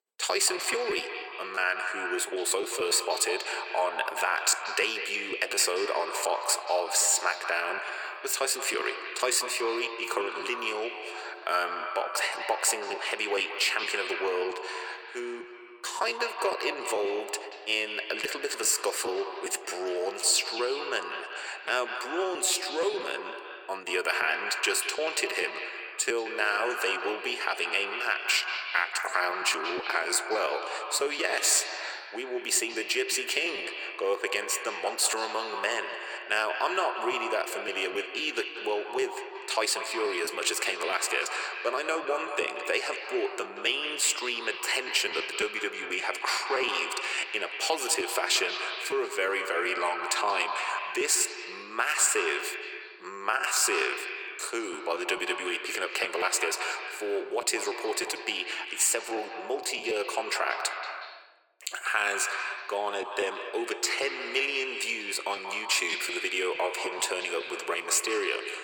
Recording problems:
echo of what is said; strong; throughout; 180 ms later, 7 dB below the speech
thin; very; fading below 350 Hz
choppy; very; 5% of the speech affected

